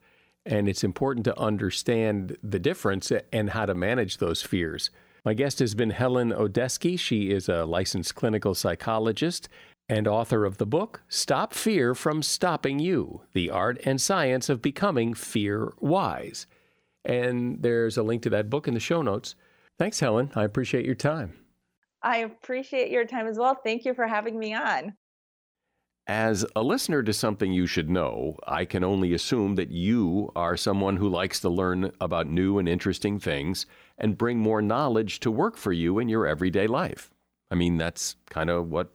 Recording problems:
none

